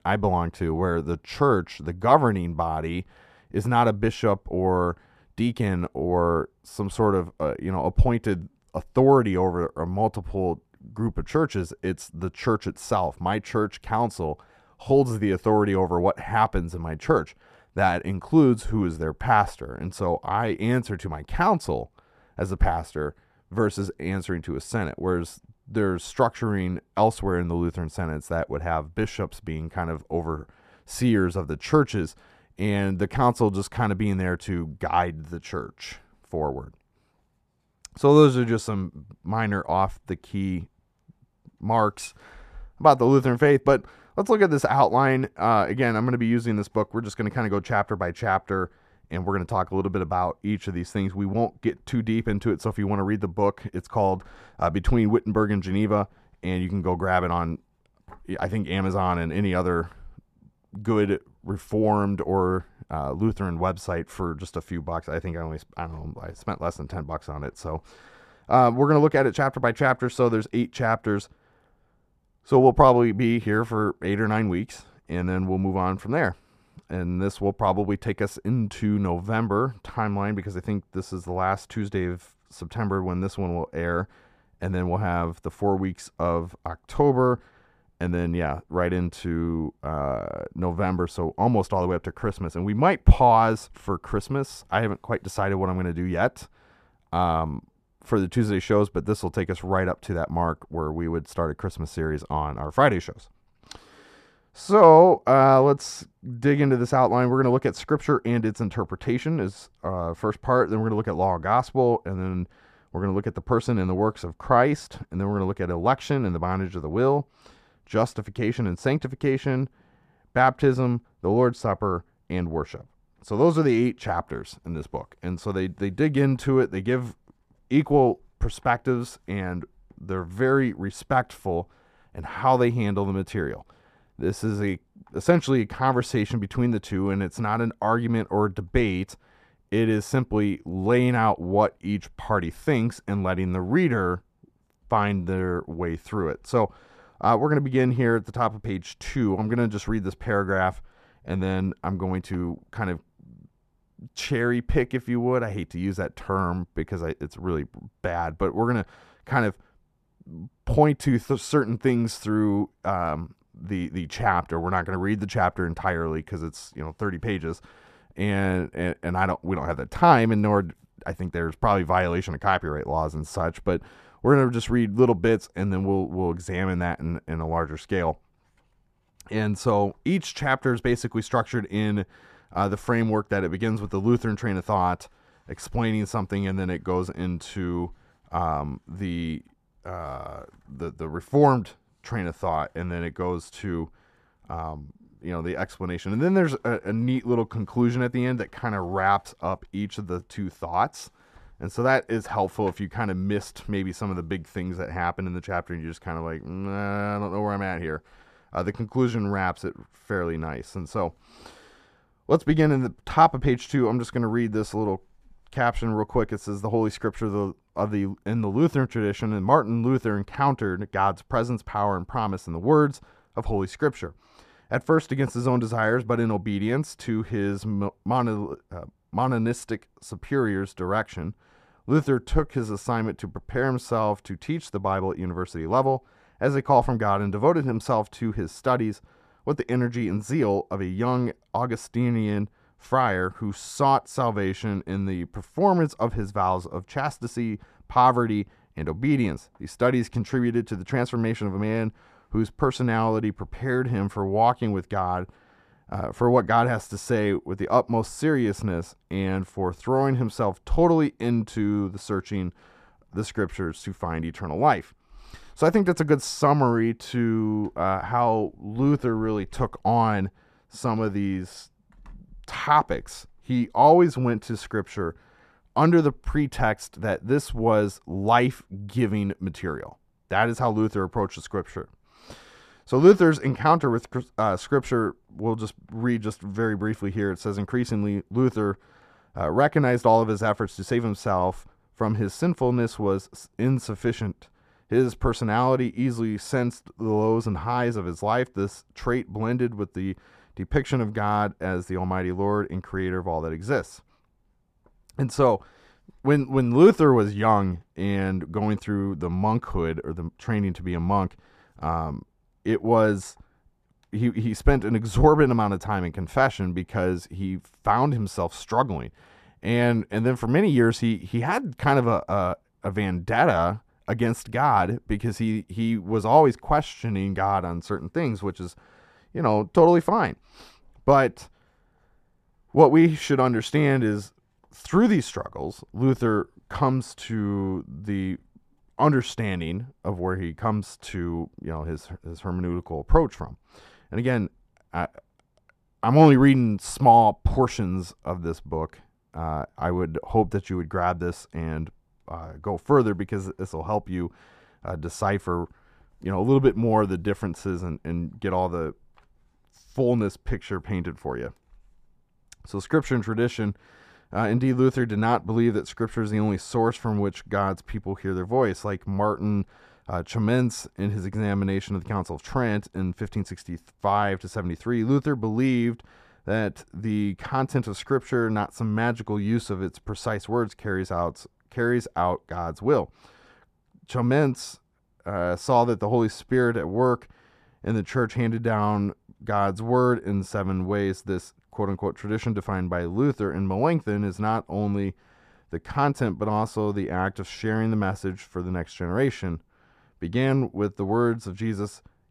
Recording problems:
muffled; slightly; fading above 2.5 kHz

